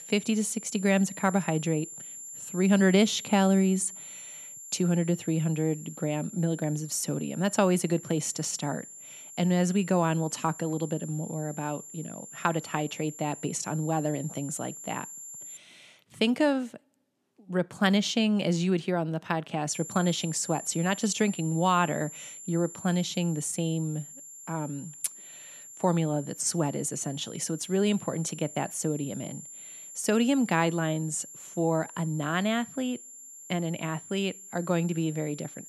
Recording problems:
high-pitched whine; noticeable; until 16 s and from 20 s on; 7.5 kHz, 15 dB below the speech

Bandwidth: 13.5 kHz